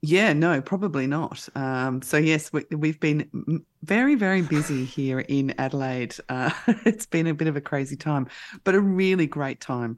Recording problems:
none

